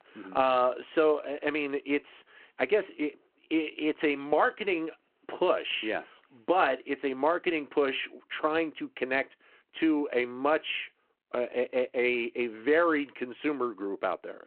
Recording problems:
phone-call audio

